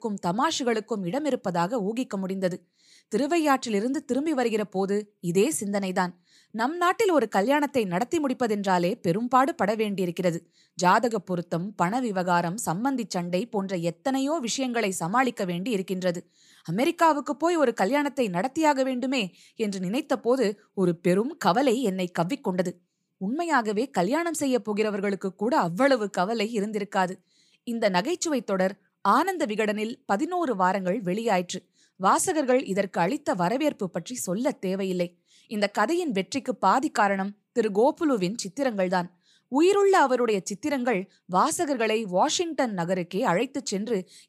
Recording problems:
none

